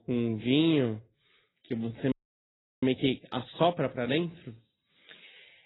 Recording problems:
garbled, watery; badly; nothing above 4 kHz
wrong speed, natural pitch; too slow; 0.6 times normal speed
audio freezing; at 2 s for 0.5 s

